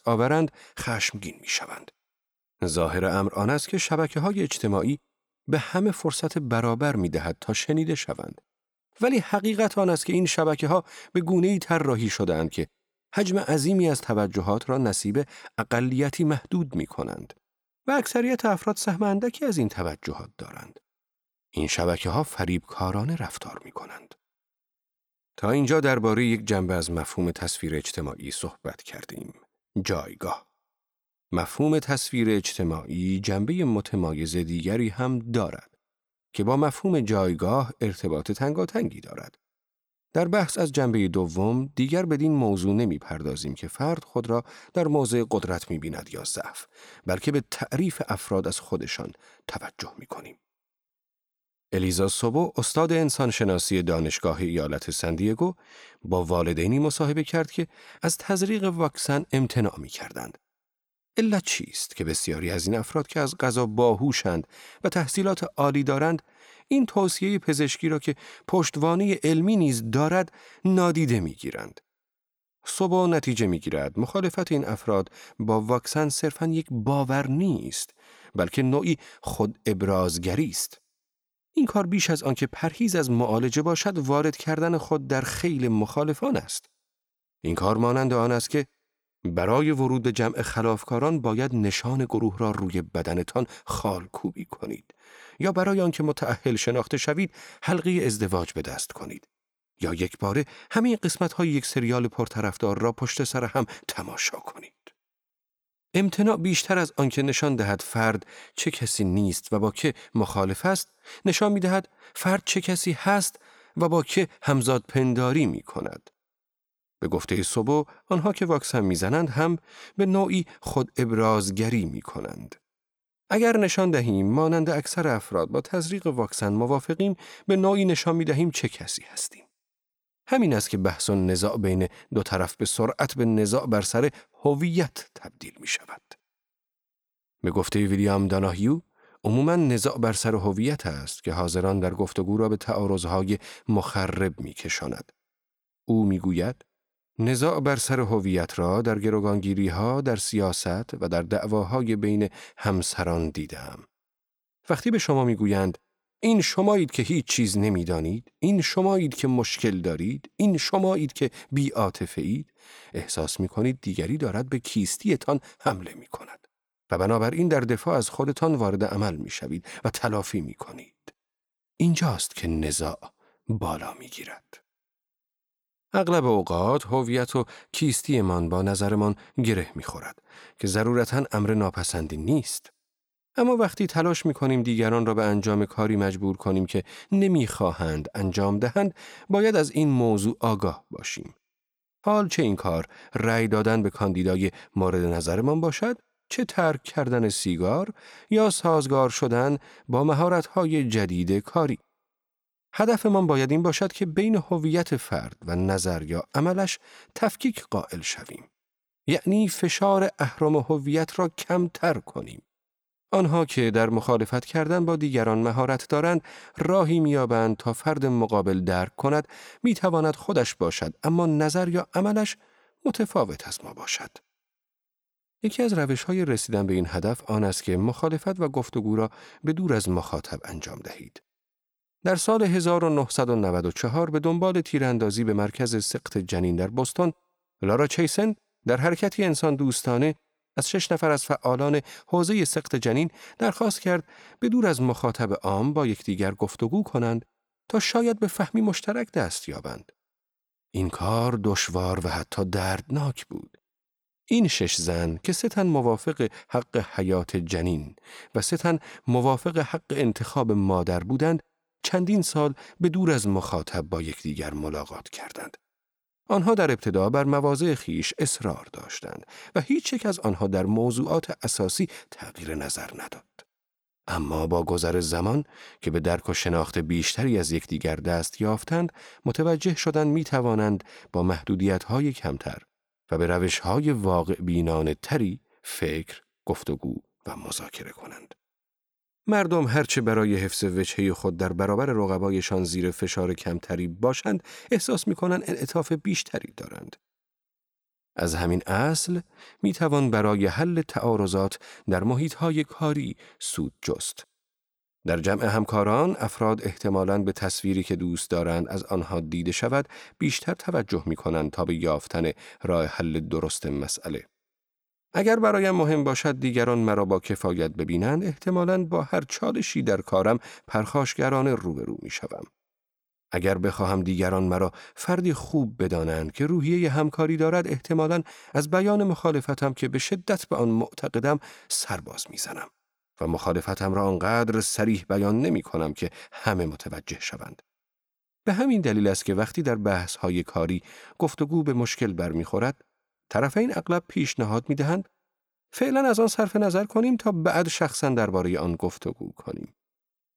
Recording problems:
none

